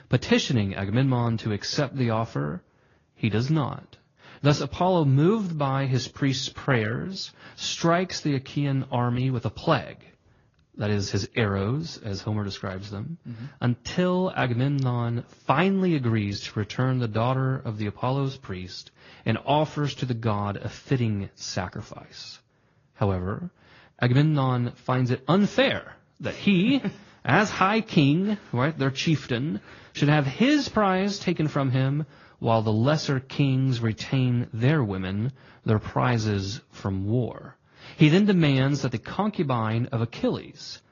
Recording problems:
high frequencies cut off; noticeable; nothing above 6.5 kHz
garbled, watery; slightly

